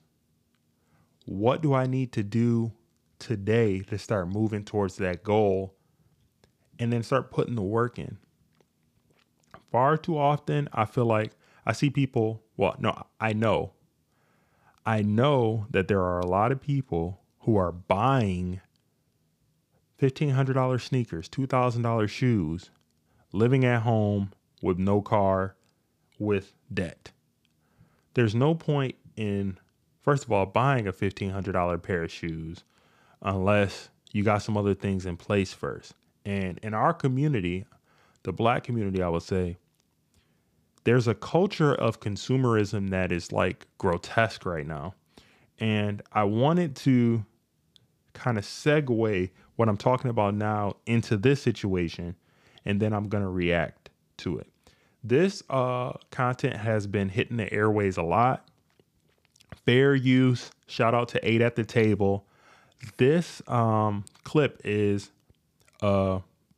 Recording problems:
none

